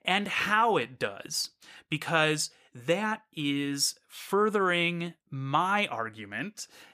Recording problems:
none

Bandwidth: 15 kHz